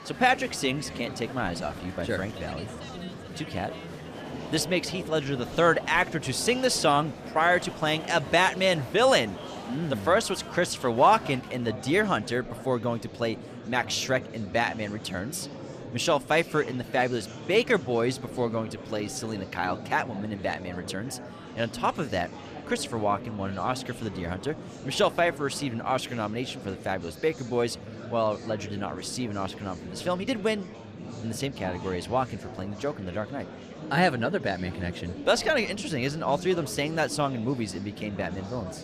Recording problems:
murmuring crowd; noticeable; throughout; 10 dB below the speech

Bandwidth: 14.5 kHz